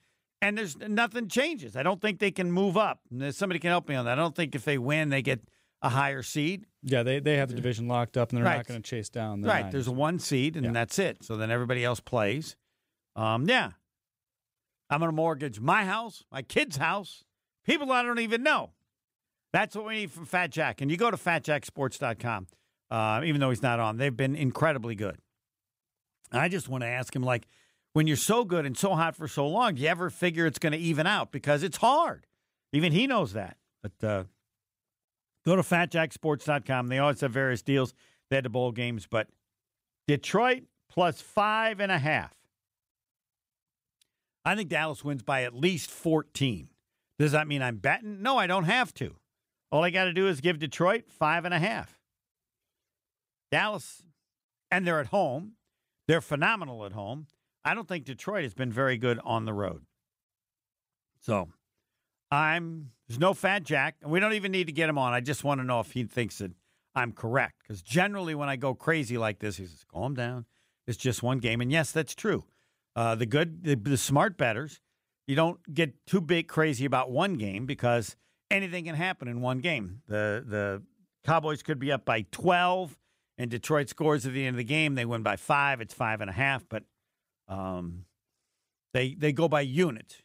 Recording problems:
none

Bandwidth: 15.5 kHz